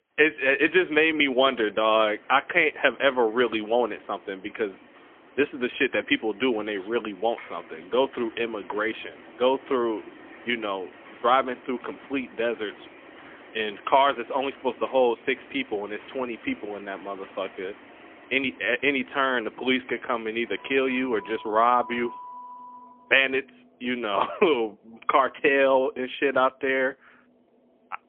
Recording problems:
phone-call audio; poor line; nothing above 3.5 kHz
traffic noise; faint; throughout; 20 dB below the speech

